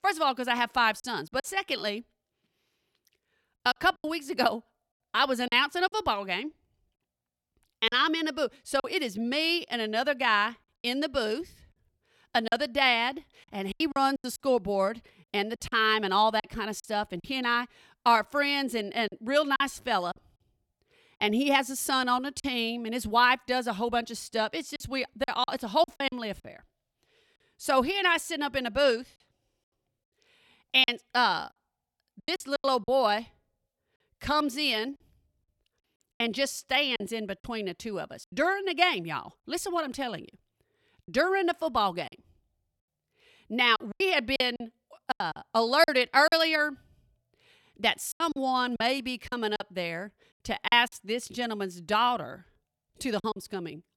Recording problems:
choppy; very; 7% of the speech affected

